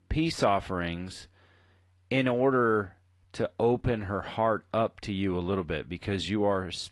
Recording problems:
garbled, watery; slightly; nothing above 11 kHz

